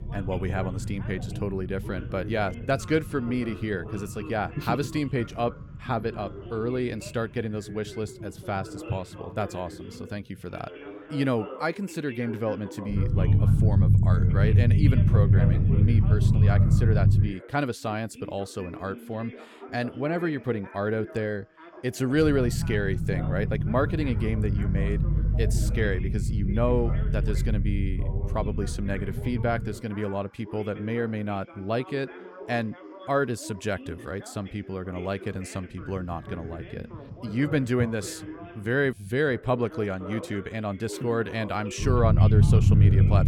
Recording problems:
low rumble; loud; until 17 s, from 22 to 30 s and from 36 s on; 6 dB below the speech
background chatter; noticeable; throughout; 2 voices, 15 dB below the speech

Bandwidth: 17.5 kHz